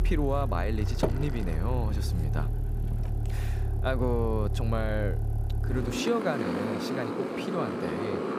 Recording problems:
traffic noise; very loud; throughout; 2 dB above the speech

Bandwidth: 15.5 kHz